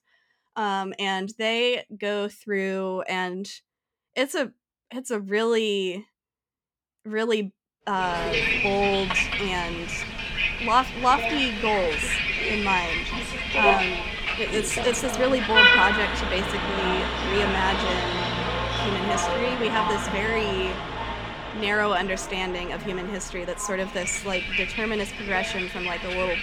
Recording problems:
traffic noise; very loud; from 8 s on; 2 dB above the speech

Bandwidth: 18.5 kHz